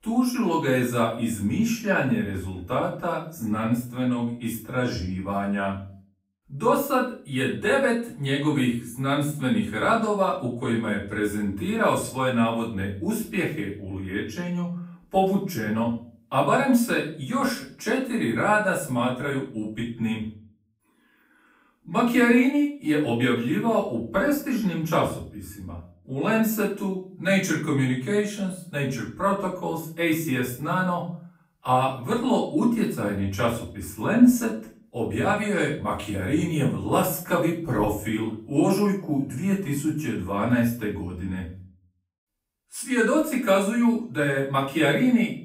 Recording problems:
off-mic speech; far
room echo; slight; dies away in 0.4 s

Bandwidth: 15.5 kHz